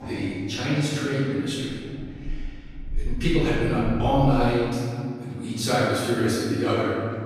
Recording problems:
room echo; strong; dies away in 2.3 s
off-mic speech; far
traffic noise; noticeable; throughout; 15 dB below the speech

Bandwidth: 15 kHz